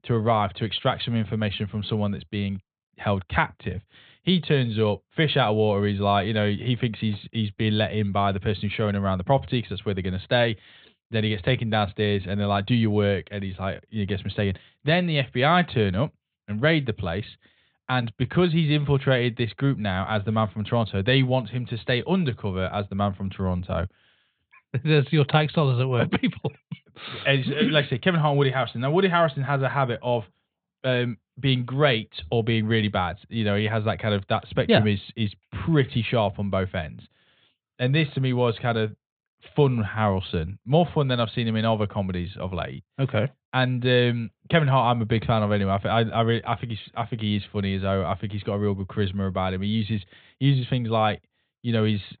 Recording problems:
high frequencies cut off; severe; nothing above 4 kHz

